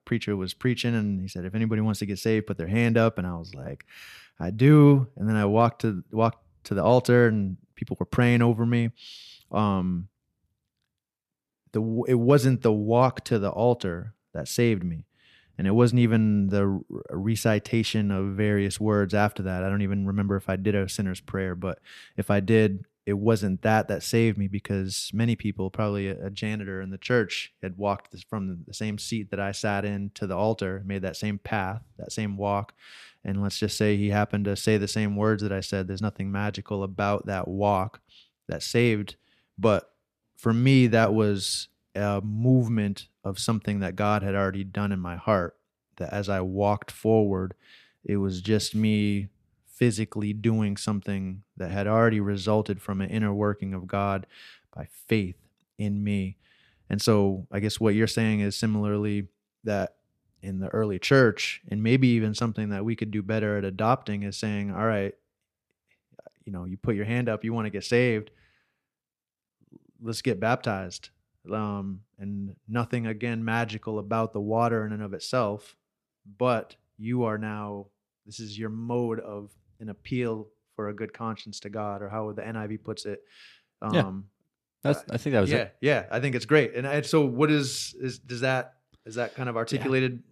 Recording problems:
none

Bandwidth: 14.5 kHz